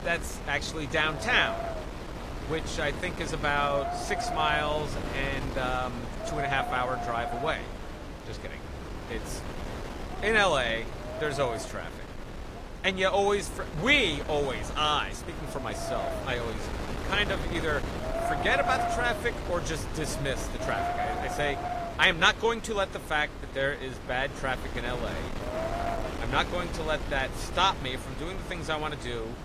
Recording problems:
garbled, watery; slightly; nothing above 18.5 kHz
wind noise on the microphone; heavy; 8 dB below the speech
animal sounds; faint; throughout; 20 dB below the speech

